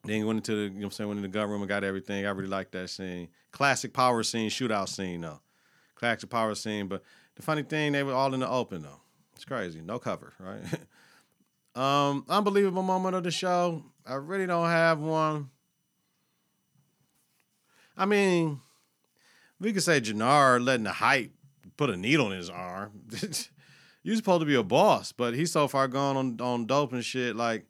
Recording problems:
none

